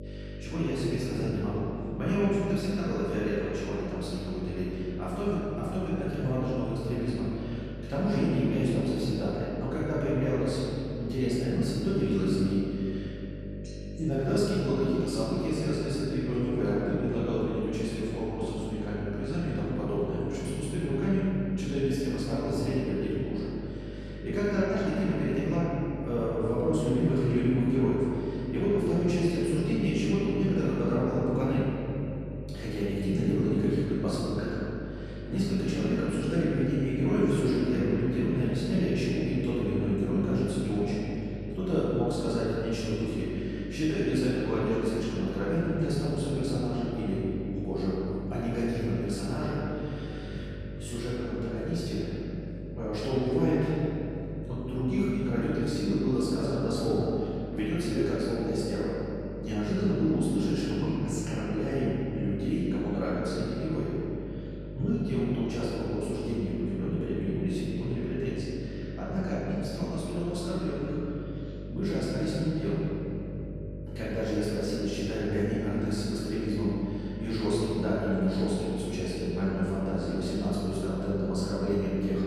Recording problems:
room echo; strong; dies away in 2.7 s
off-mic speech; far
electrical hum; noticeable; throughout; 50 Hz, 15 dB below the speech

